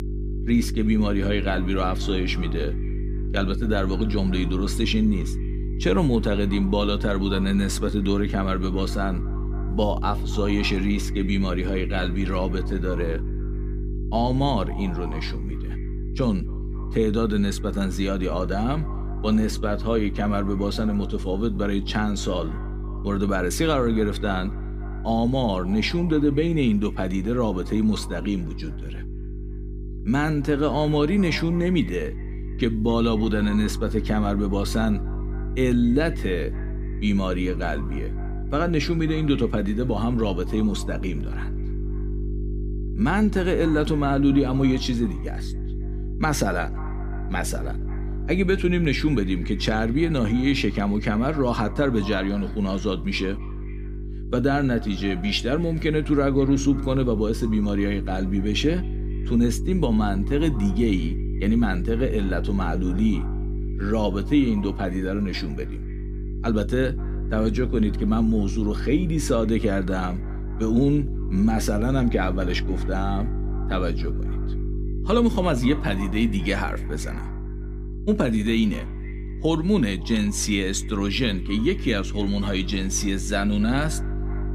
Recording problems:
echo of what is said; faint; throughout; 270 ms later, 25 dB below the speech
electrical hum; noticeable; throughout; 50 Hz, 15 dB below the speech

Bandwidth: 15 kHz